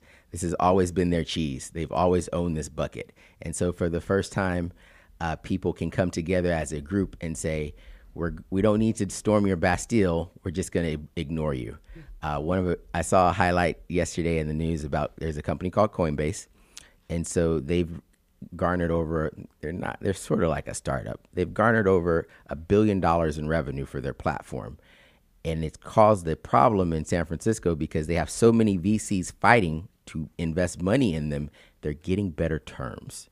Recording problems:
none

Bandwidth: 15 kHz